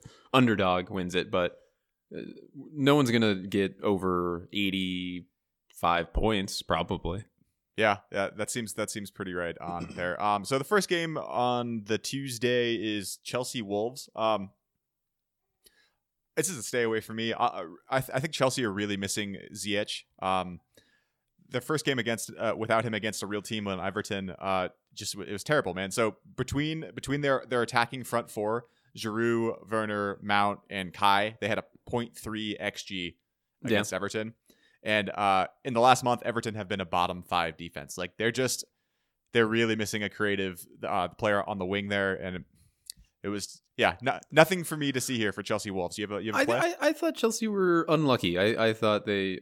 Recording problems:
none

